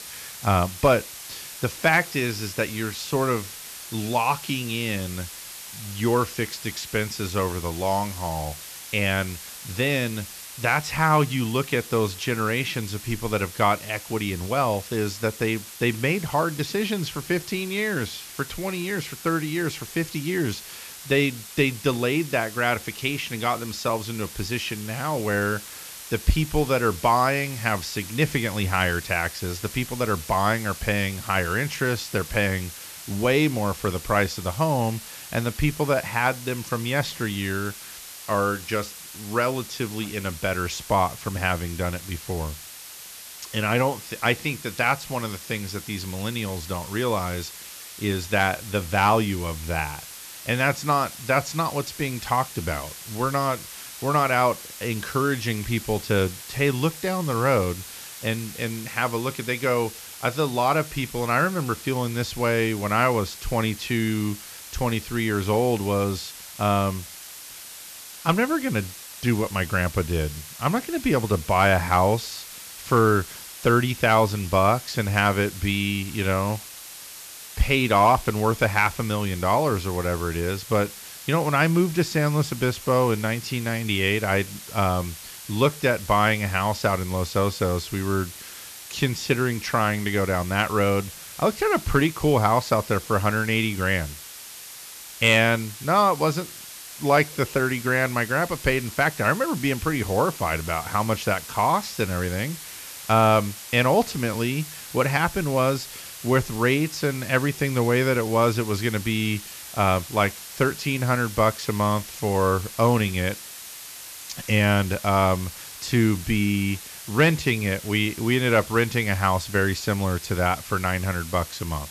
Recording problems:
hiss; noticeable; throughout; 15 dB below the speech

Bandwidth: 14 kHz